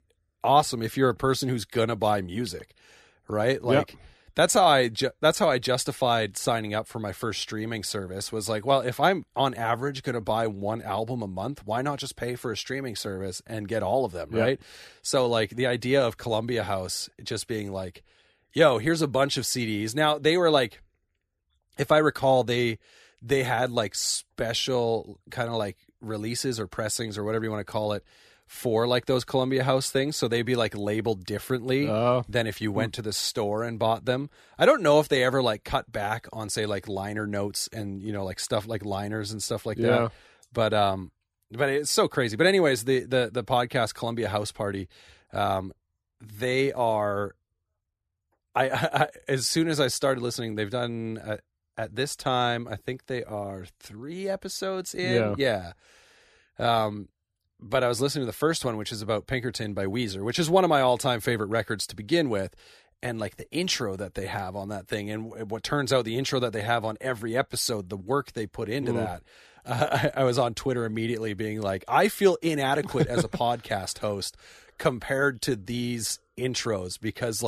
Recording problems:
abrupt cut into speech; at the end

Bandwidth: 14.5 kHz